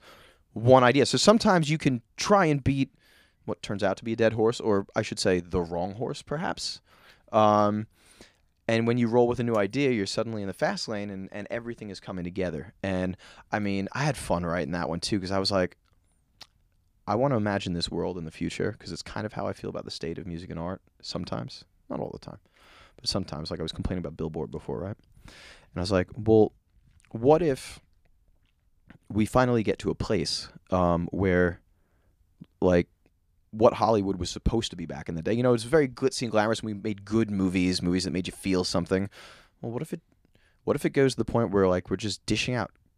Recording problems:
none

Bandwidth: 15 kHz